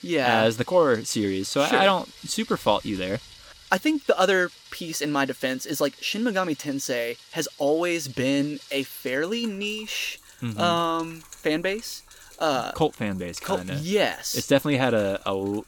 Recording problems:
rain or running water; faint; throughout; 20 dB below the speech

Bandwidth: 18 kHz